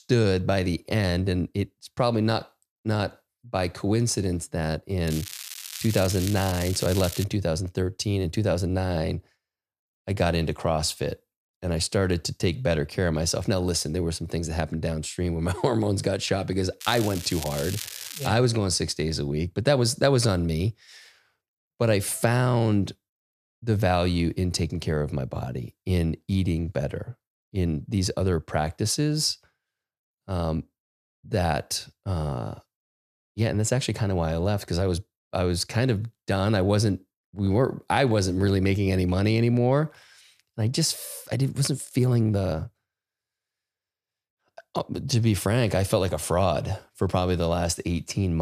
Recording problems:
crackling; loud; from 5 to 7.5 s and from 17 to 18 s; 10 dB below the speech
abrupt cut into speech; at the end

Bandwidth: 14.5 kHz